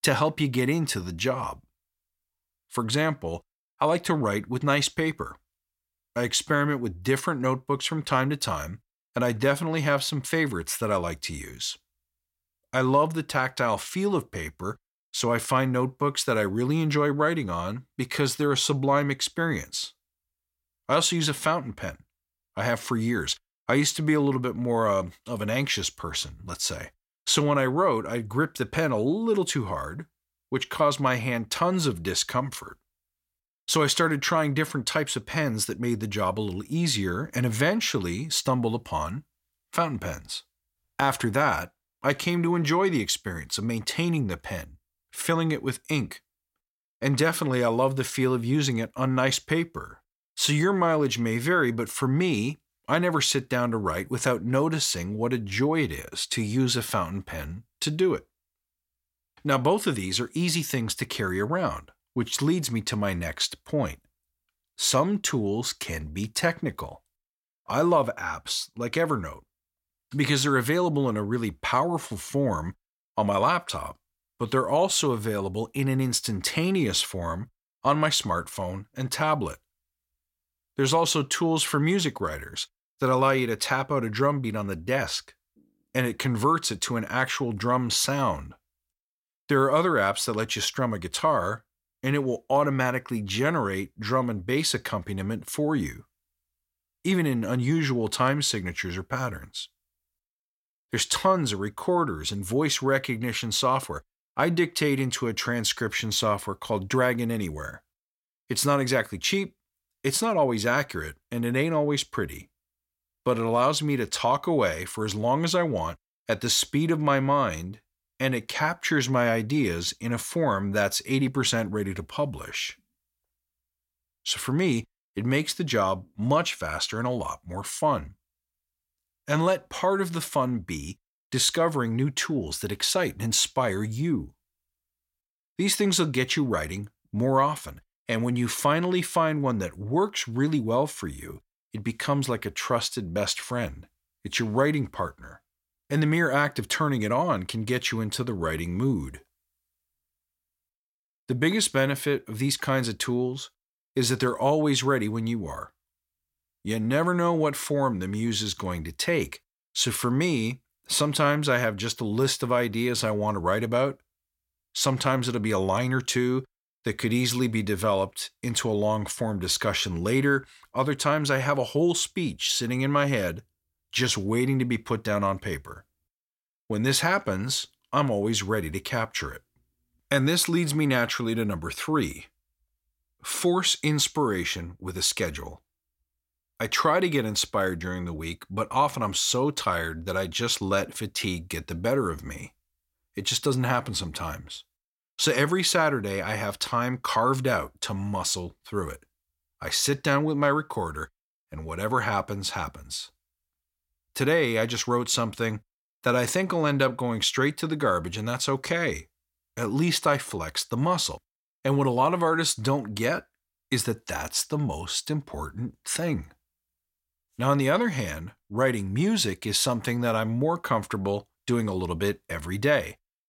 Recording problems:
none

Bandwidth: 16.5 kHz